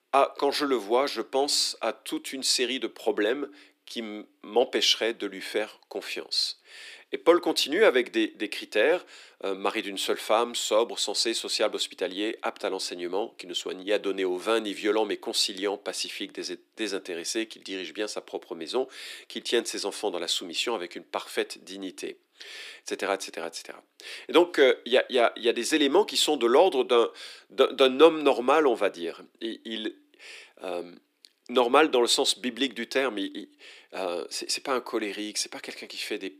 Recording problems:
thin; somewhat; fading below 300 Hz

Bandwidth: 15 kHz